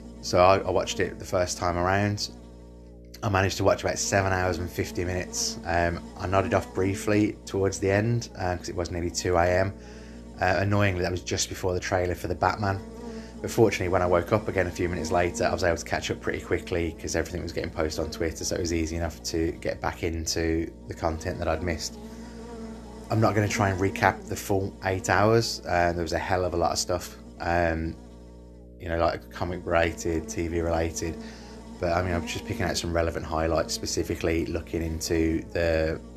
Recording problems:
electrical hum; noticeable; throughout; 60 Hz, 20 dB below the speech

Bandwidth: 13.5 kHz